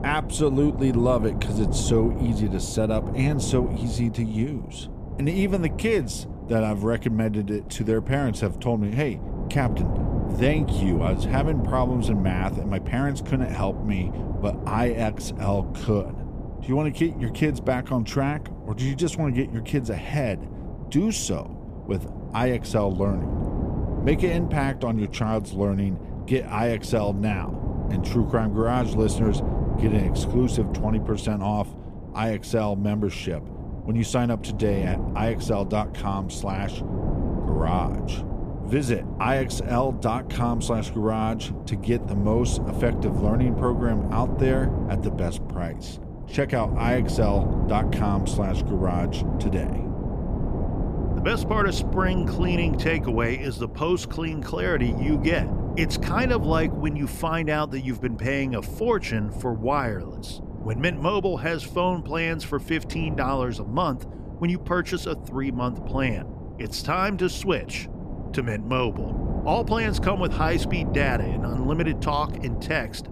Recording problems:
wind noise on the microphone; heavy; 10 dB below the speech

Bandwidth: 14.5 kHz